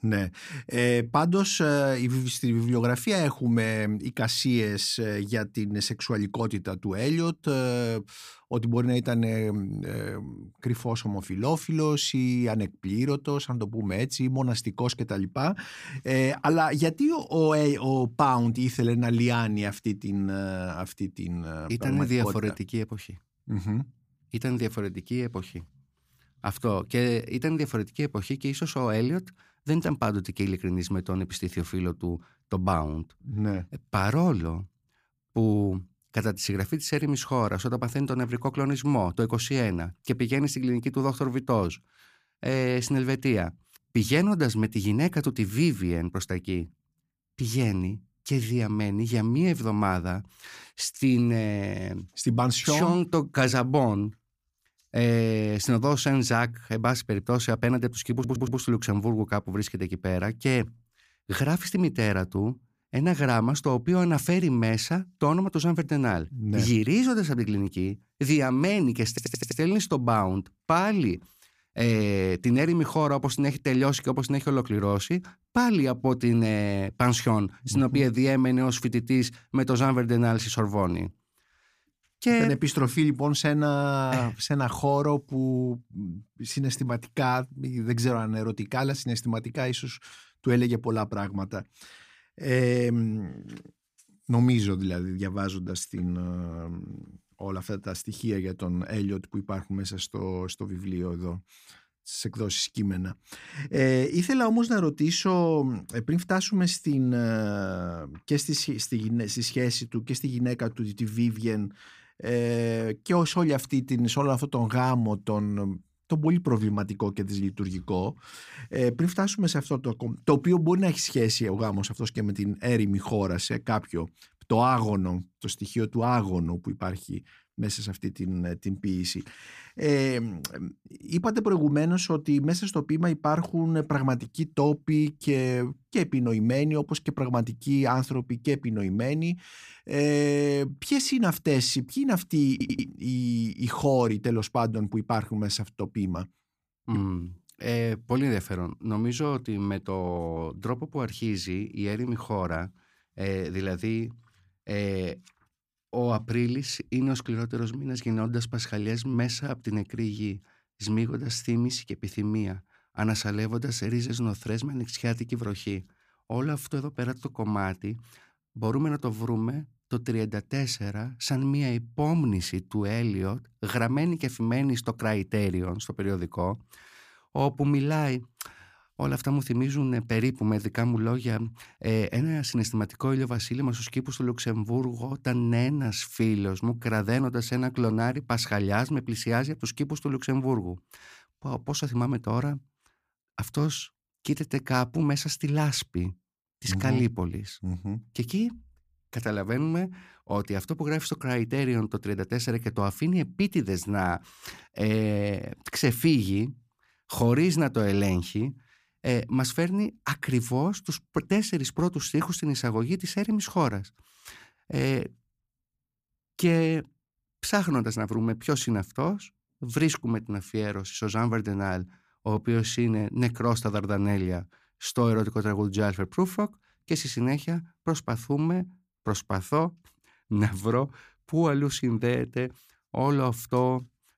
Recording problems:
audio stuttering; at 58 s, at 1:09 and at 2:23

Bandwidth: 15 kHz